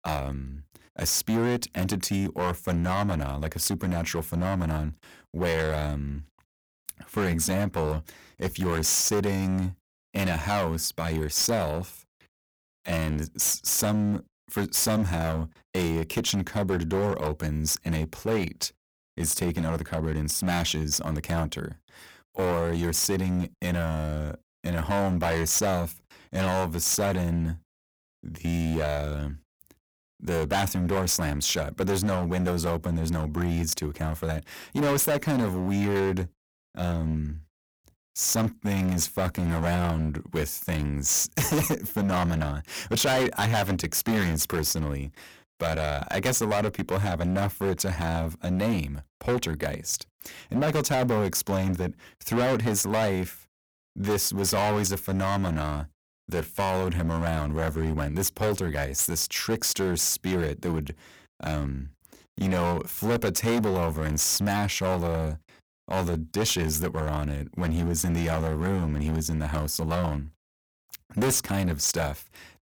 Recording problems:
distortion; heavy; 13% of the sound clipped

